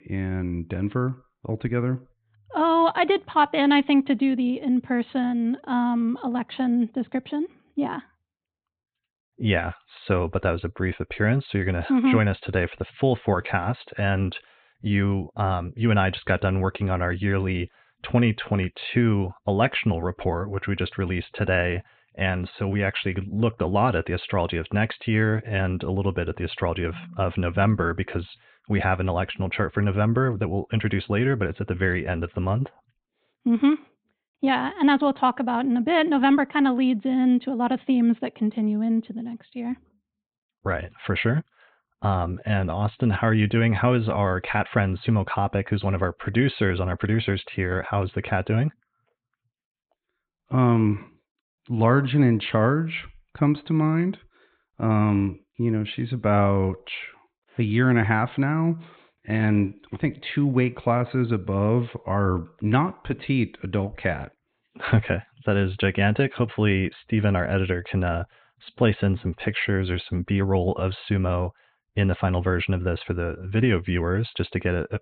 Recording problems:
high frequencies cut off; severe; nothing above 4 kHz

